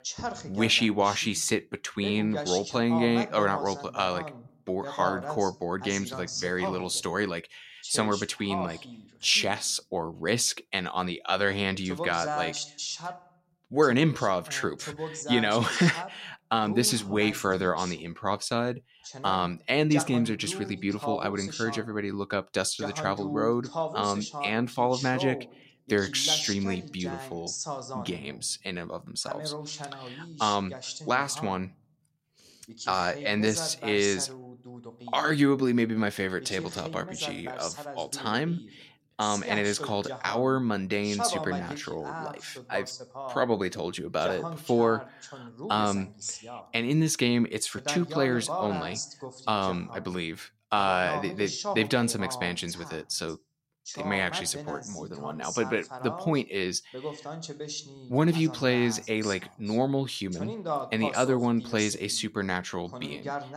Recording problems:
voice in the background; loud; throughout; 9 dB below the speech

